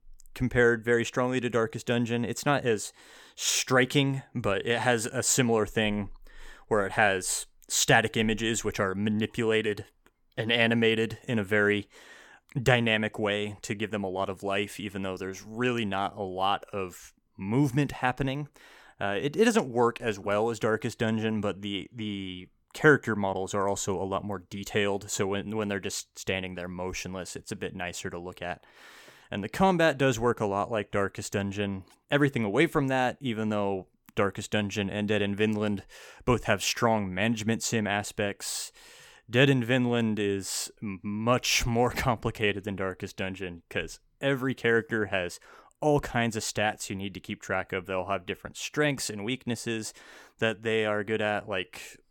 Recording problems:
none

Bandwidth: 17.5 kHz